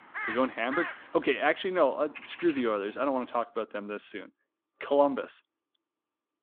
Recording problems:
phone-call audio
animal sounds; loud; until 3.5 s; 9 dB below the speech

